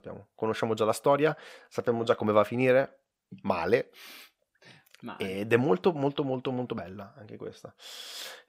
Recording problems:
none

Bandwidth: 15.5 kHz